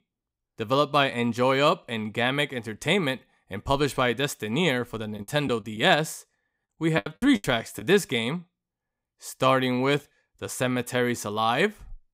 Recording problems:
choppy; very; from 5 to 8 s; 14% of the speech affected

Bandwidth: 15.5 kHz